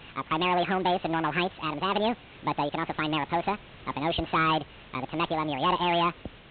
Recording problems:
high frequencies cut off; severe; nothing above 4 kHz
wrong speed and pitch; too fast and too high; 1.7 times normal speed
distortion; slight; 6% of the sound clipped
hiss; faint; throughout; 20 dB below the speech

